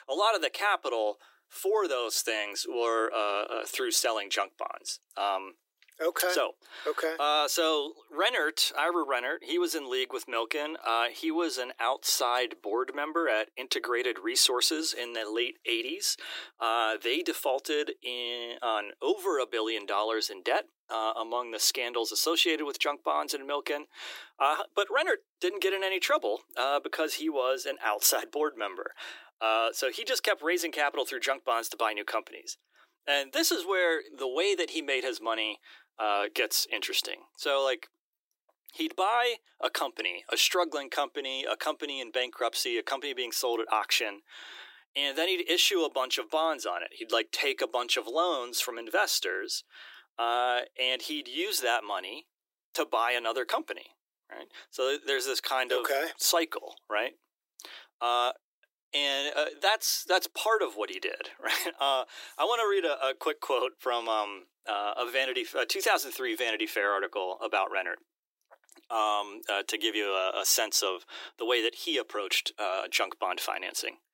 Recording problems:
thin; very; fading below 350 Hz

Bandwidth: 16 kHz